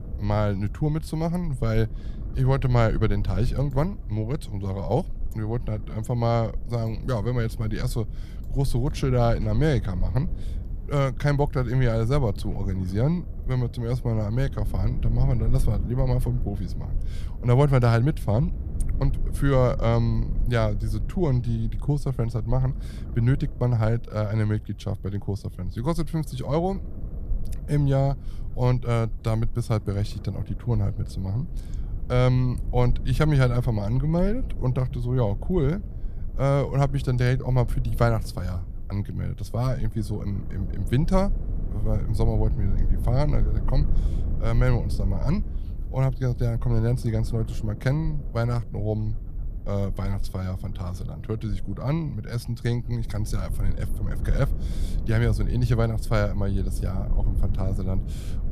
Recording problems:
low rumble; noticeable; throughout; 15 dB below the speech

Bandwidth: 14.5 kHz